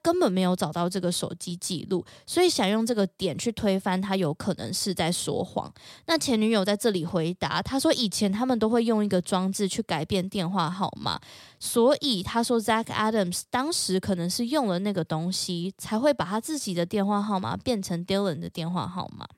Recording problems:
none

